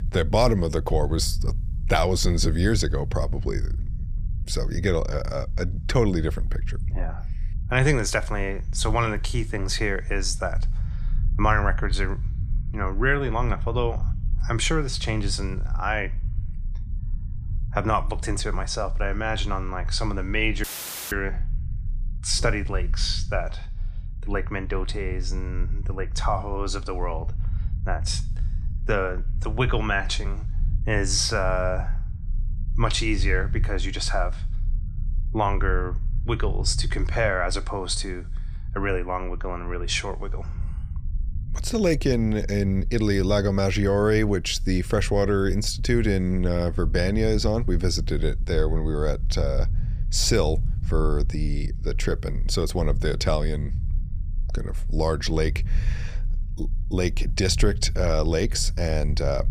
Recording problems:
low rumble; faint; throughout; 20 dB below the speech
audio cutting out; filled with static; at 21 s

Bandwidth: 15 kHz